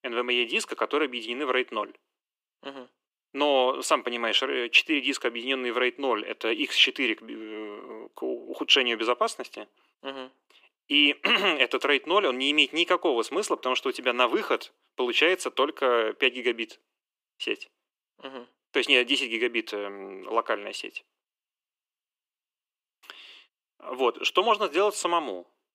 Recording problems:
thin; somewhat; fading below 300 Hz

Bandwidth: 15.5 kHz